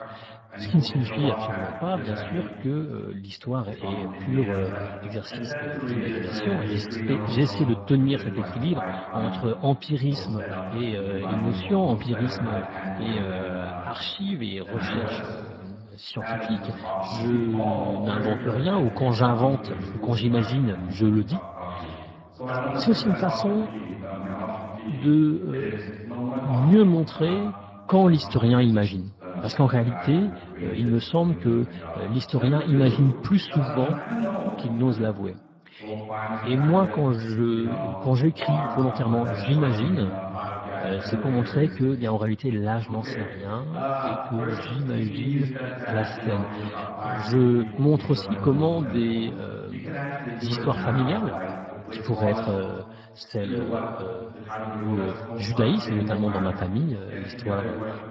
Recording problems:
garbled, watery; badly
voice in the background; loud; throughout; 7 dB below the speech

